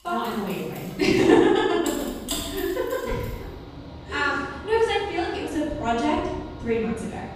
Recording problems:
room echo; strong; dies away in 1 s
off-mic speech; far
machinery noise; noticeable; throughout; 15 dB below the speech

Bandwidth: 14.5 kHz